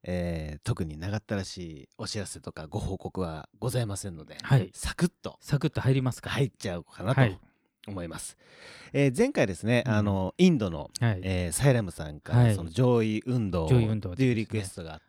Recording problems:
none

